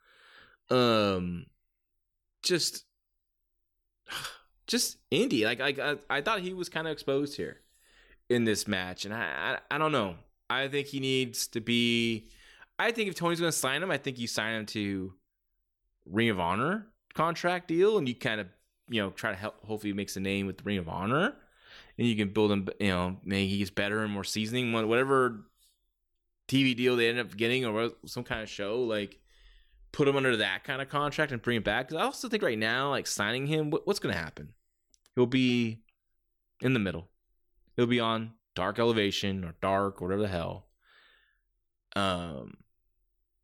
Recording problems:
none

